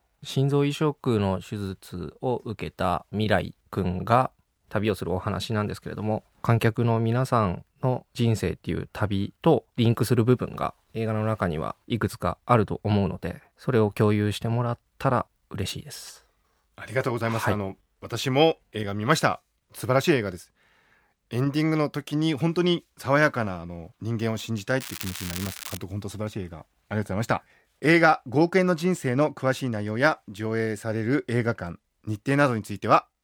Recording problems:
crackling; loud; at 25 s; 10 dB below the speech

